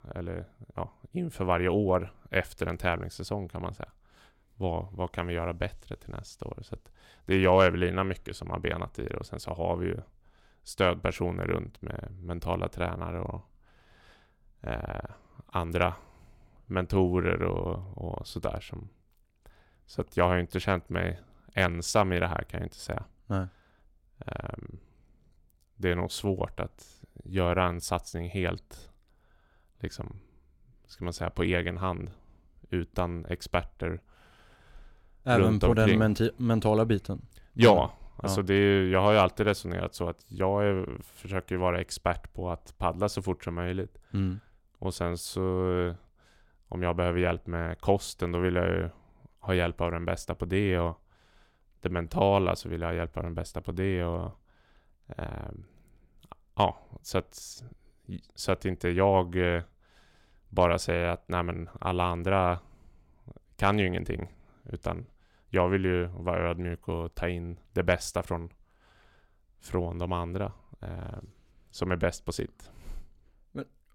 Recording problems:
none

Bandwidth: 16.5 kHz